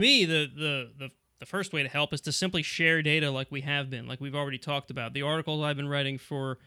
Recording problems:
abrupt cut into speech; at the start

